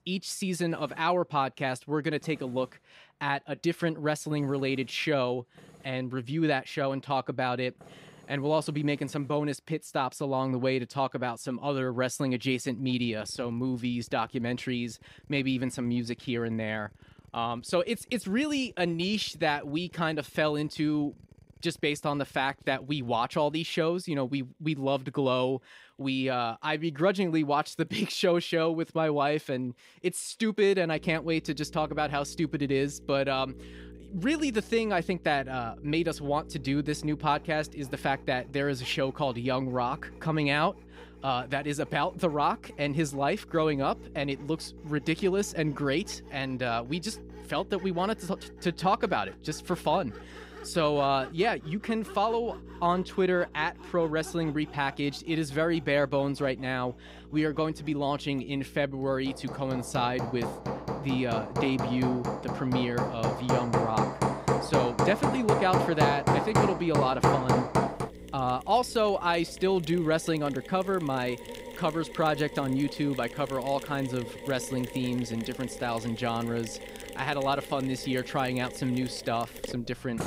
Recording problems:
machinery noise; loud; throughout; 4 dB below the speech
electrical hum; faint; from 31 s to 1:10; 60 Hz, 25 dB below the speech

